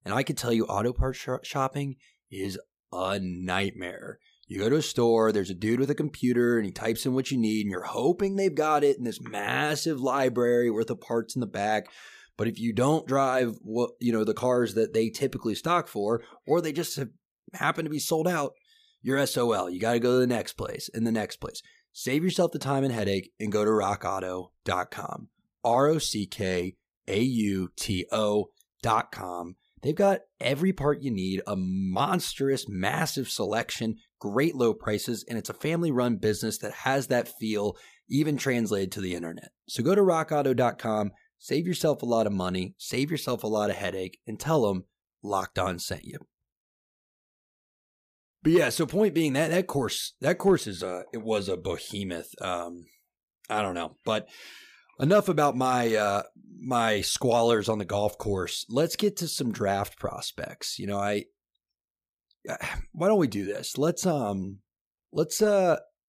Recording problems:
none

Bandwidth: 15 kHz